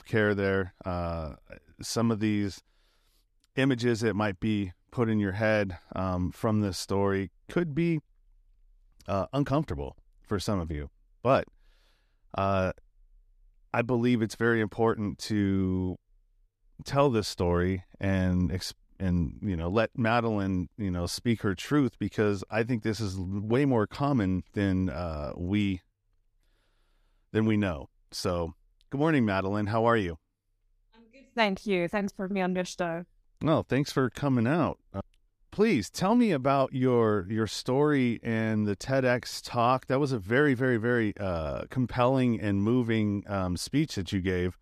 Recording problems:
none

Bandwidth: 14.5 kHz